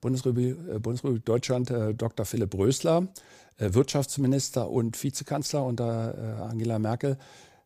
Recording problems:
none

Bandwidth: 15 kHz